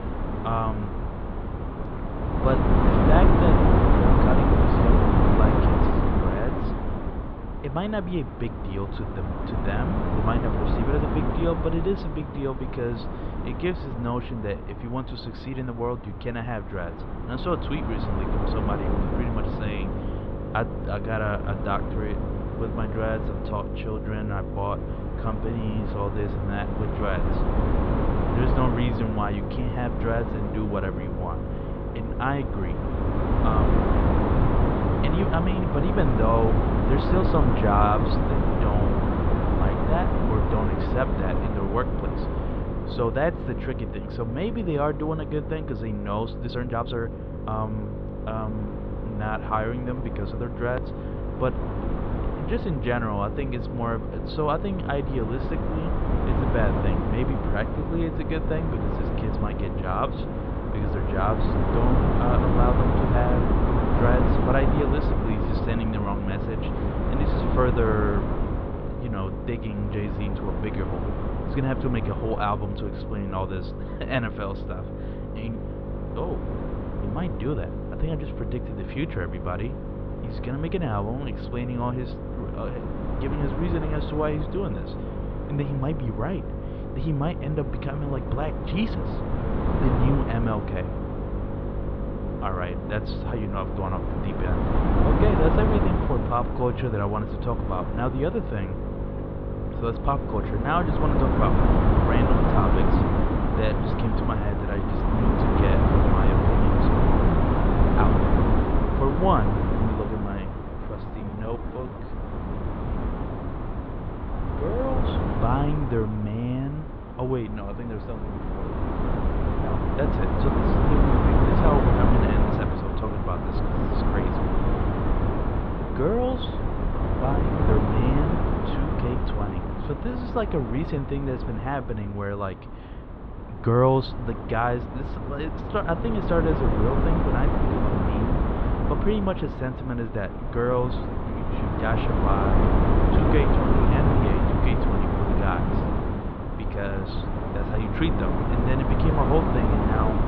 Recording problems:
muffled; slightly; fading above 3.5 kHz
wind noise on the microphone; heavy; as loud as the speech
electrical hum; loud; from 18 s to 1:42; 50 Hz, 9 dB below the speech
uneven, jittery; strongly; from 46 s to 2:08

